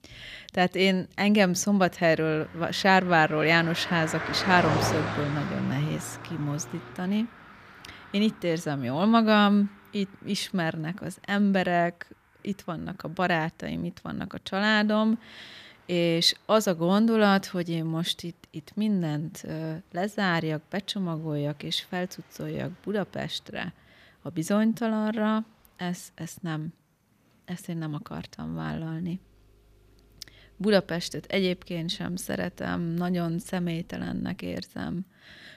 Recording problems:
traffic noise; loud; throughout; 9 dB below the speech

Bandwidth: 14.5 kHz